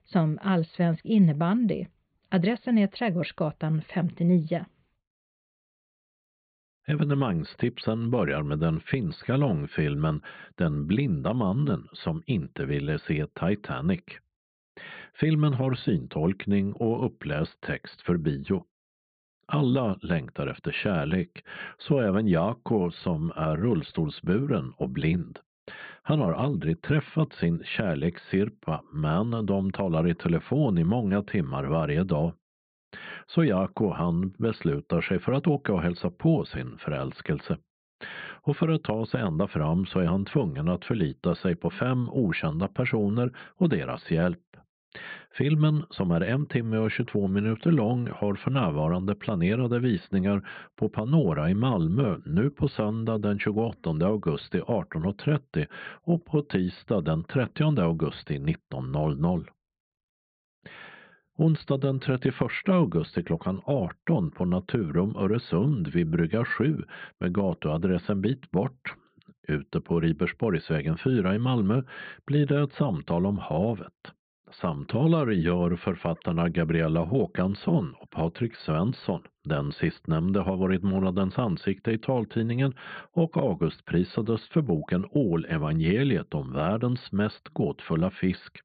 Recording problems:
high frequencies cut off; severe; nothing above 4.5 kHz
muffled; very slightly; fading above 3 kHz

